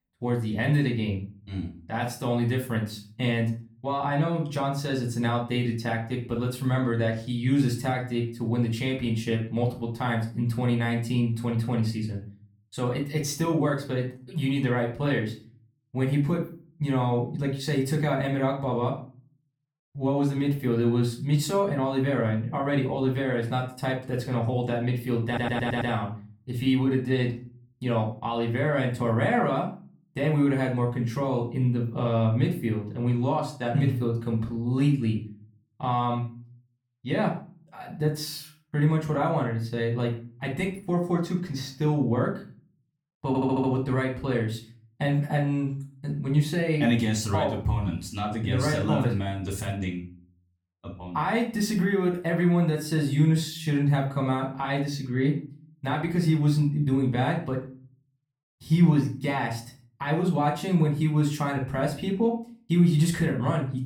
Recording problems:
off-mic speech; far
room echo; slight; dies away in 0.4 s
audio stuttering; at 25 s and at 43 s

